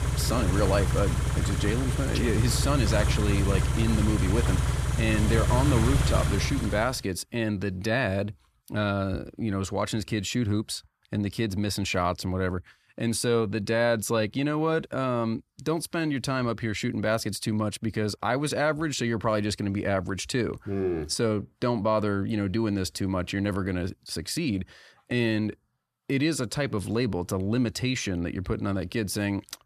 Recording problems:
traffic noise; very loud; until 6.5 s; 1 dB above the speech

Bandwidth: 14.5 kHz